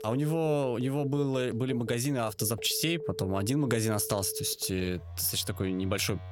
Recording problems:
alarms or sirens; noticeable; throughout; 15 dB below the speech

